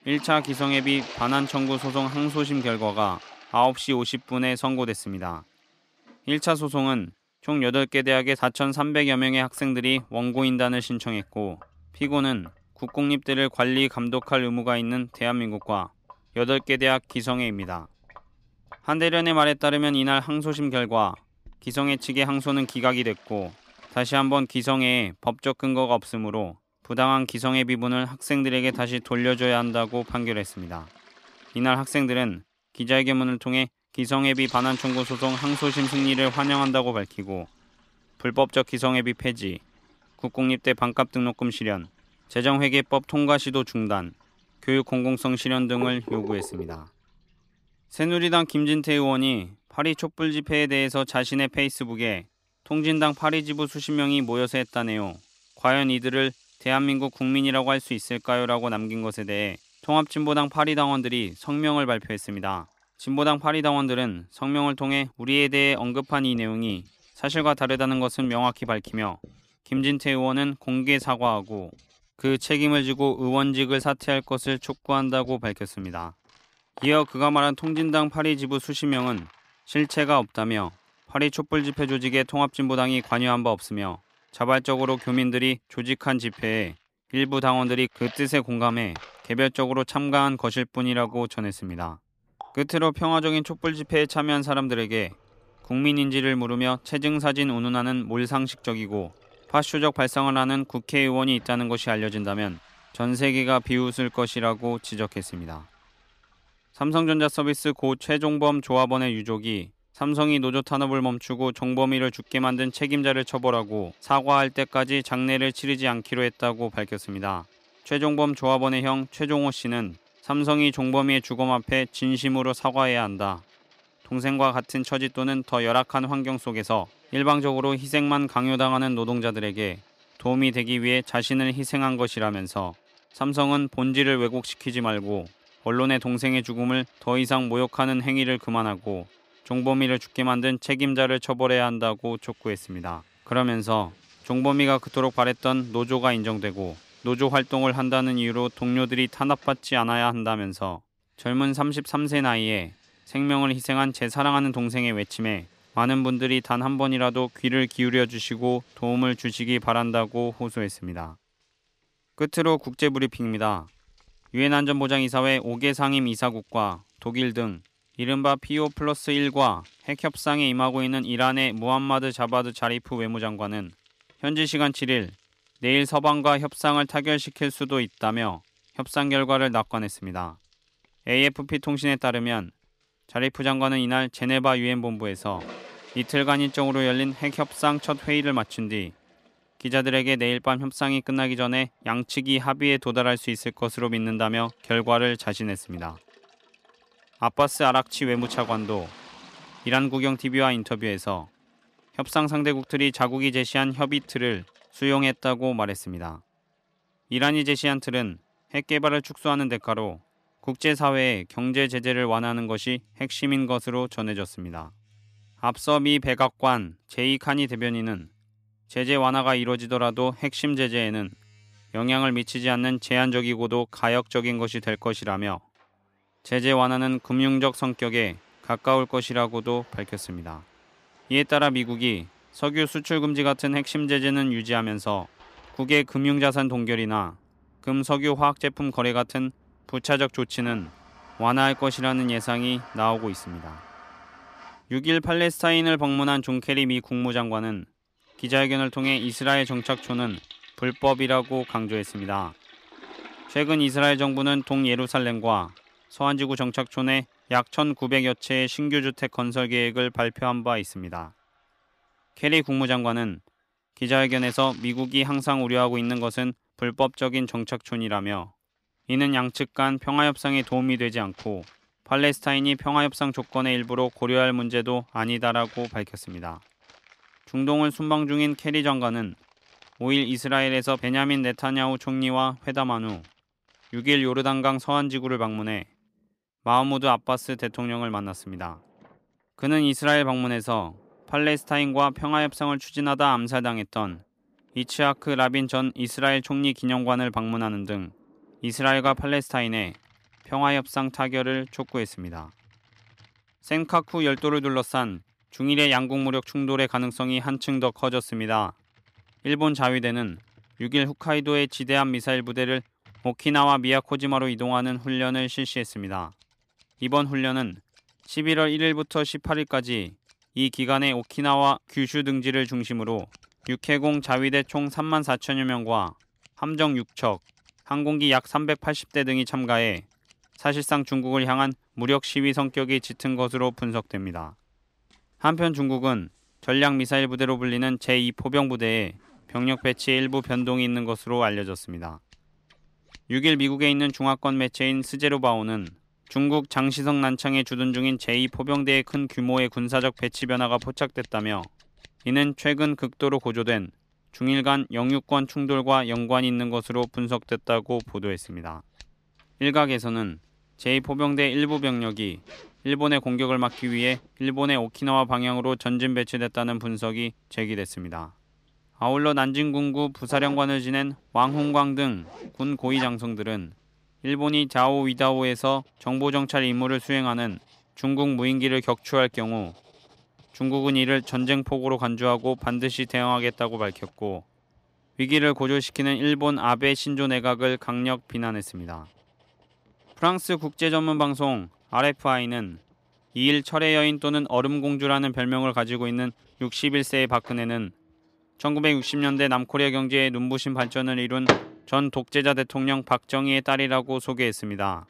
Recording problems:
household noises; faint; throughout; 20 dB below the speech

